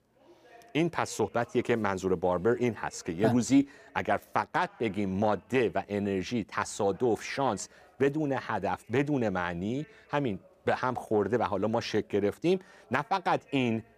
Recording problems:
voice in the background; faint; throughout; 30 dB below the speech

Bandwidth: 15 kHz